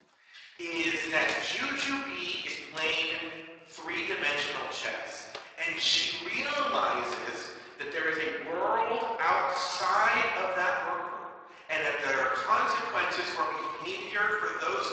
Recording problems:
off-mic speech; far
thin; very; fading below 950 Hz
room echo; noticeable; dies away in 1.5 s
garbled, watery; slightly; nothing above 7.5 kHz
uneven, jittery; strongly; from 0.5 to 14 s
footsteps; faint; from 1 to 7 s; peak 10 dB below the speech

